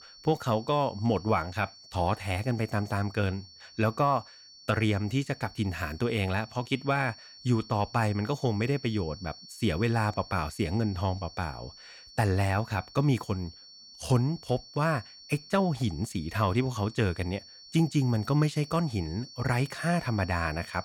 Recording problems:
high-pitched whine; noticeable; throughout; 4.5 kHz, 20 dB below the speech

